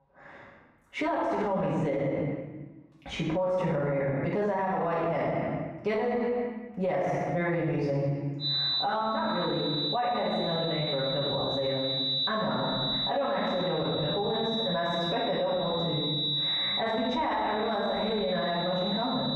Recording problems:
room echo; strong; dies away in 1 s
off-mic speech; far
squashed, flat; heavily
muffled; slightly; fading above 3 kHz
high-pitched whine; loud; from 8.5 s on; 4 kHz, 2 dB below the speech

